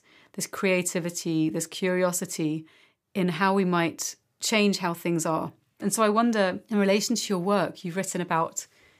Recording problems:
none

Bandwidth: 15 kHz